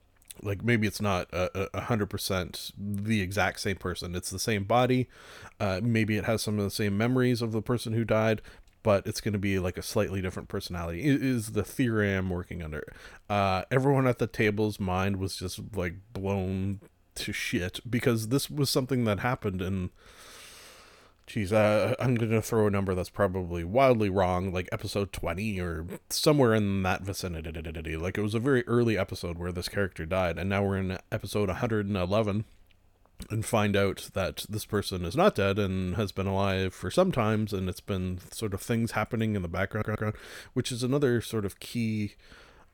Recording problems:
audio stuttering; at 27 s and at 40 s

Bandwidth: 18 kHz